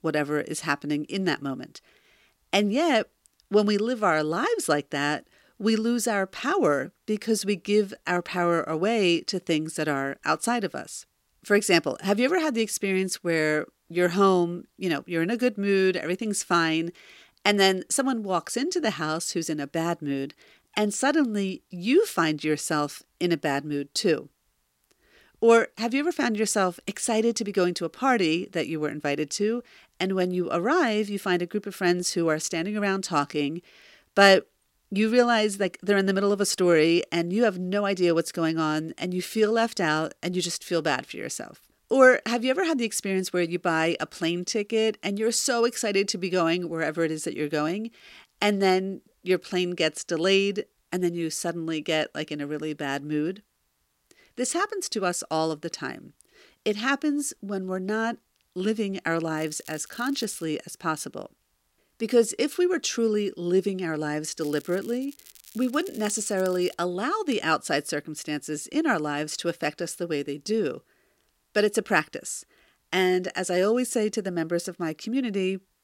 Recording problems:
crackling; faint; from 59 s to 1:00 and from 1:04 to 1:07; 20 dB below the speech

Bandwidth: 16 kHz